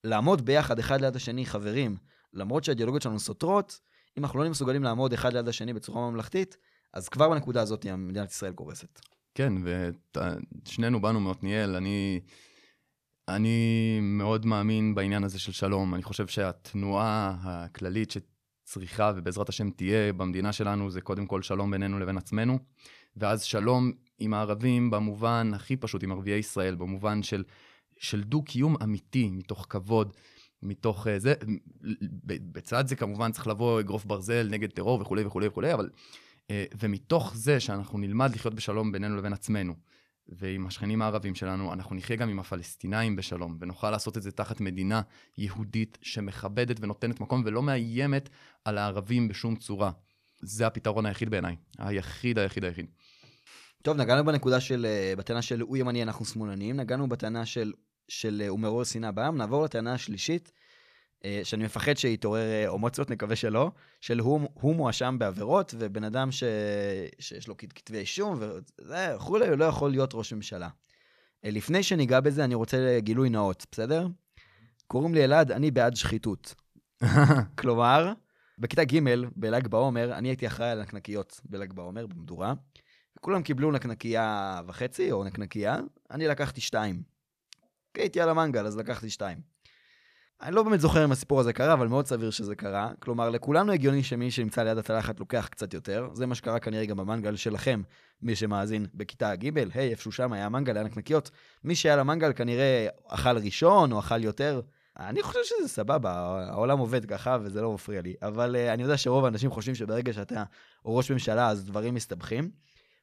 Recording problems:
none

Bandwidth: 14.5 kHz